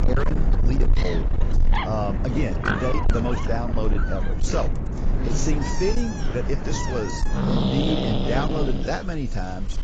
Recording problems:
distortion; heavy; 10% of the sound clipped
garbled, watery; badly; nothing above 7.5 kHz
animal sounds; very loud; throughout; 2 dB above the speech
wind noise on the microphone; occasional gusts; 15 dB below the speech

